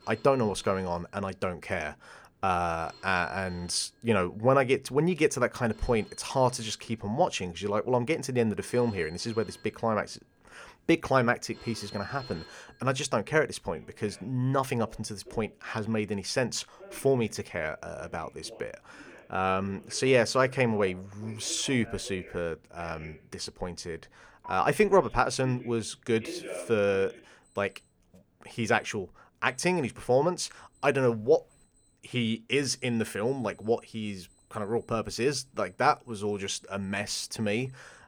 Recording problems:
alarms or sirens; noticeable; throughout; 20 dB below the speech

